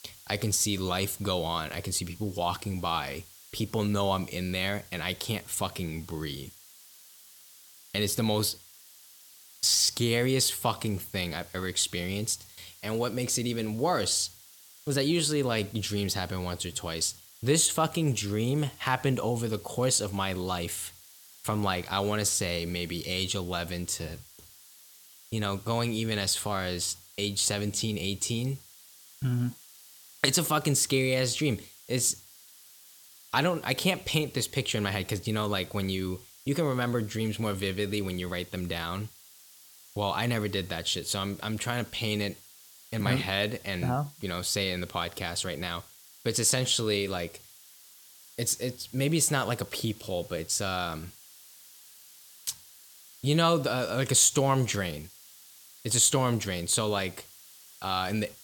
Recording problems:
hiss; faint; throughout; 20 dB below the speech

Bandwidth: 18 kHz